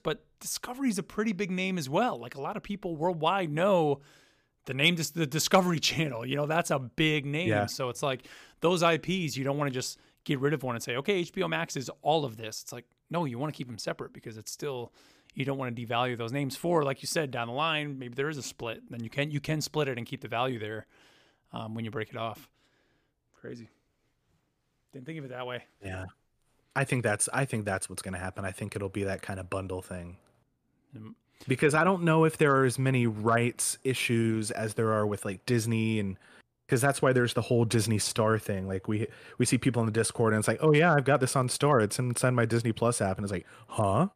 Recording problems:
none

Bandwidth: 15 kHz